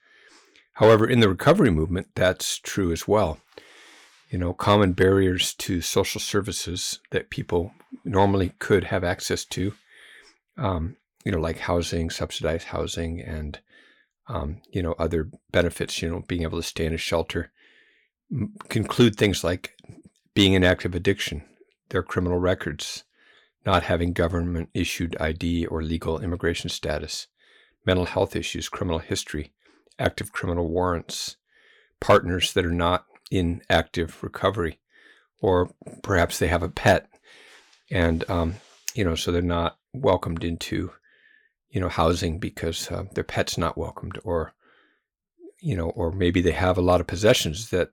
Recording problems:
none

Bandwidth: 18.5 kHz